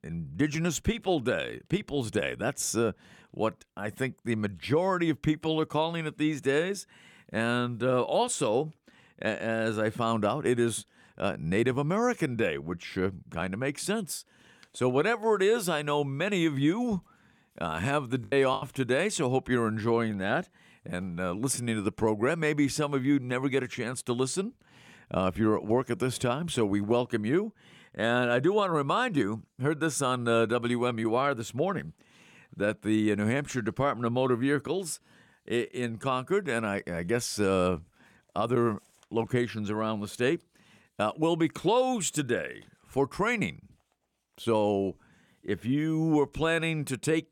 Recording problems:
choppy; very; at 18 s; 6% of the speech affected

